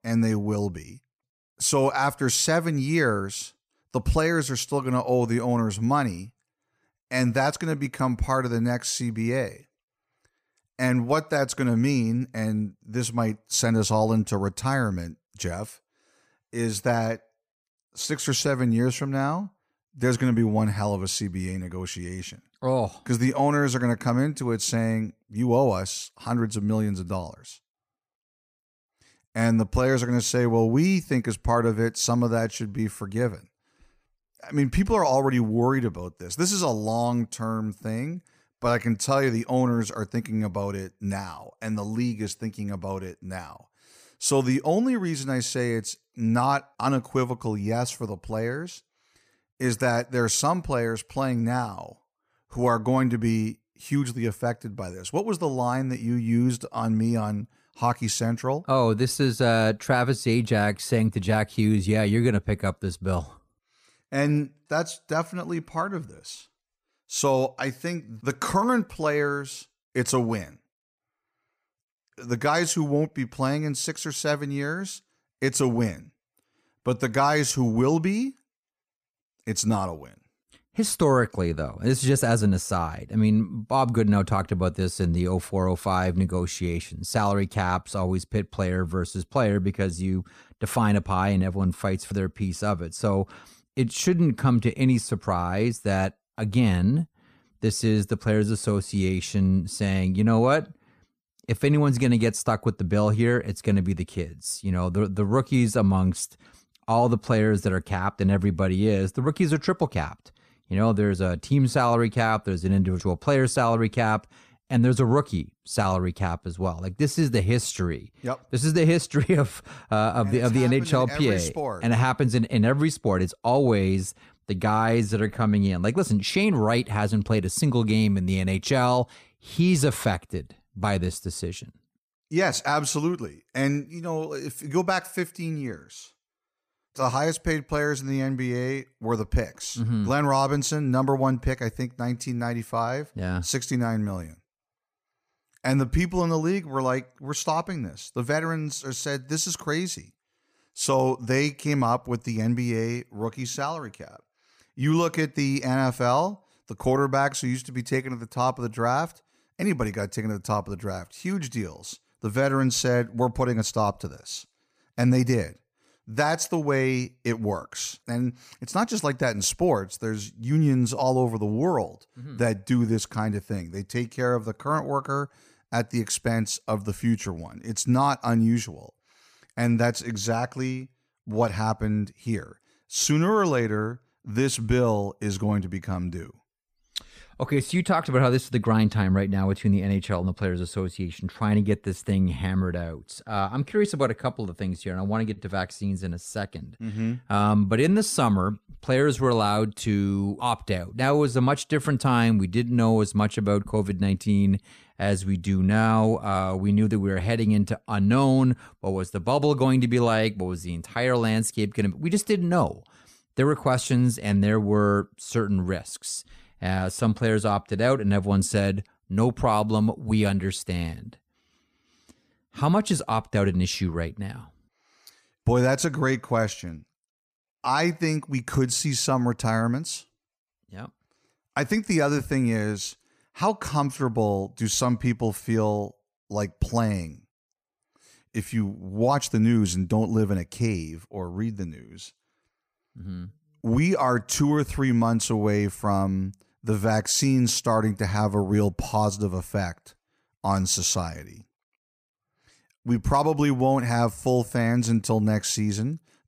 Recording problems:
none

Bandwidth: 15 kHz